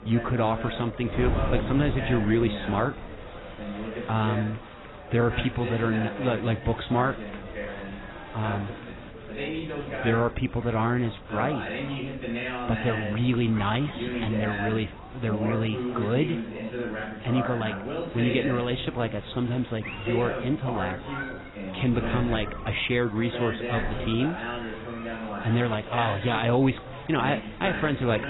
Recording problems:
garbled, watery; badly; nothing above 4 kHz
background chatter; loud; throughout; 4 voices, 7 dB below the speech
crowd noise; noticeable; throughout; 15 dB below the speech
wind noise on the microphone; occasional gusts; 15 dB below the speech

